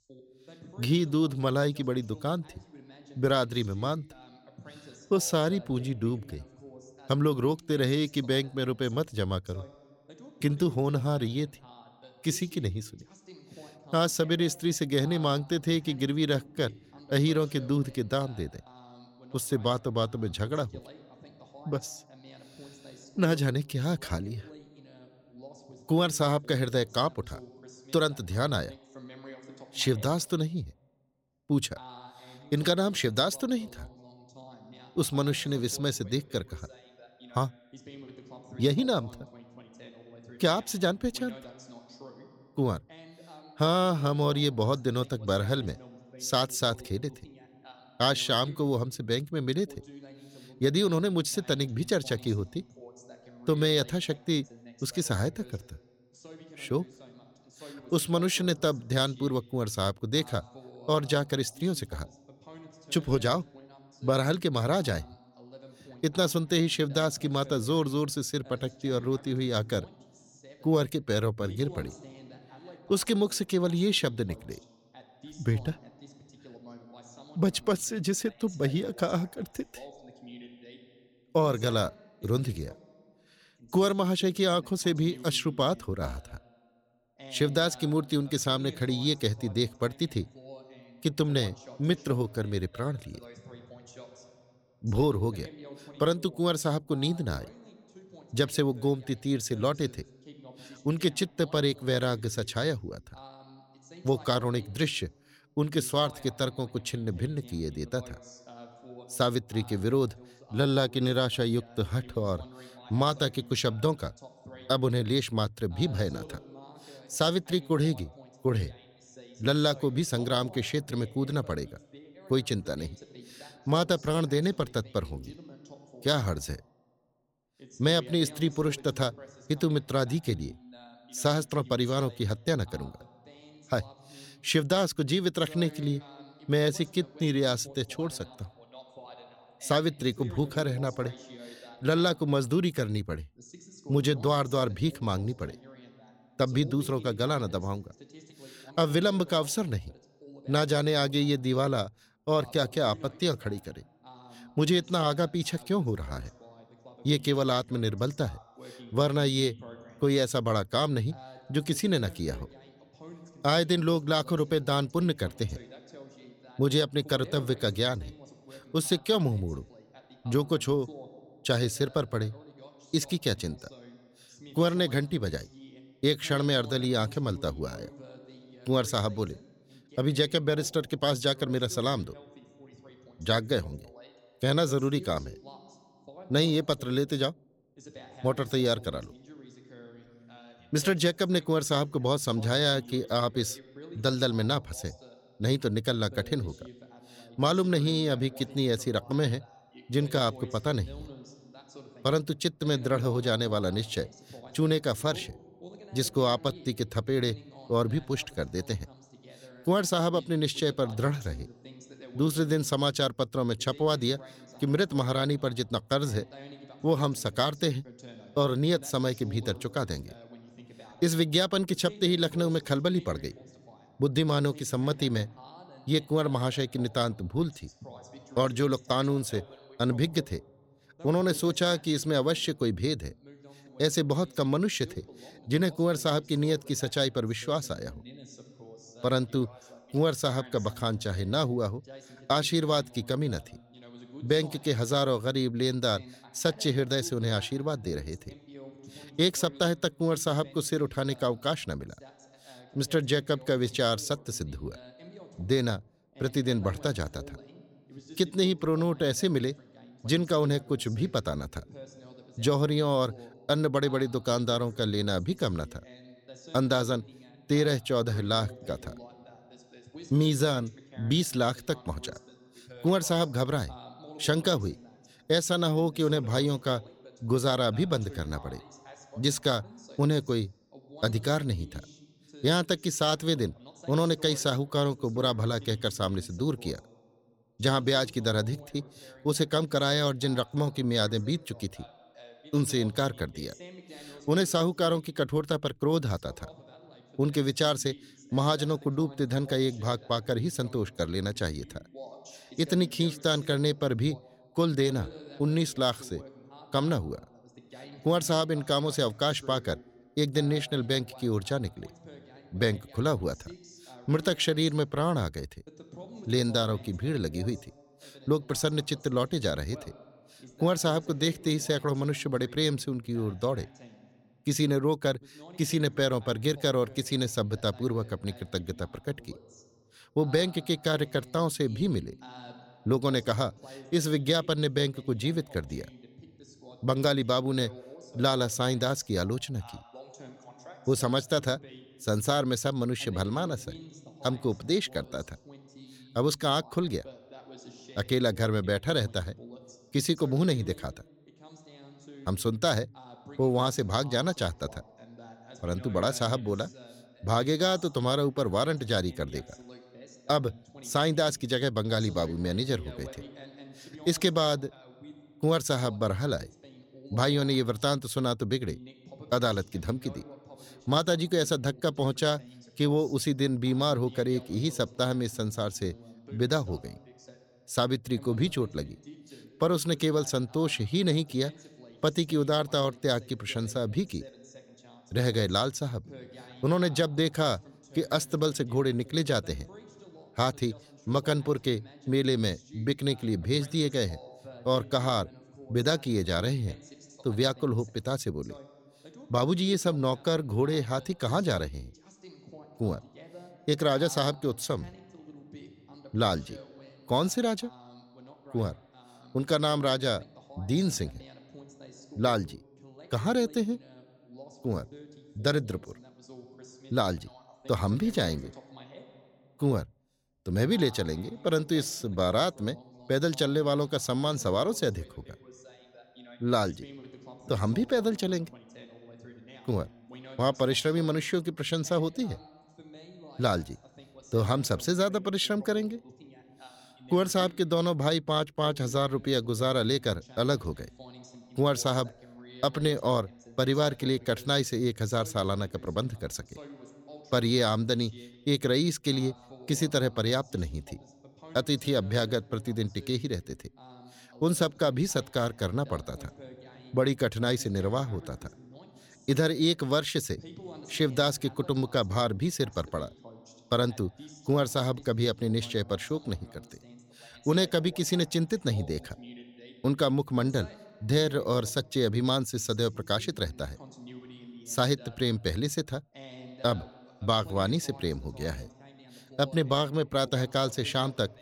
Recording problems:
voice in the background; faint; throughout; 20 dB below the speech

